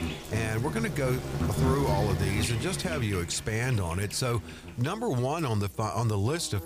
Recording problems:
animal sounds; loud; throughout; 4 dB below the speech
electrical hum; faint; throughout; 60 Hz, 25 dB below the speech

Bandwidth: 15 kHz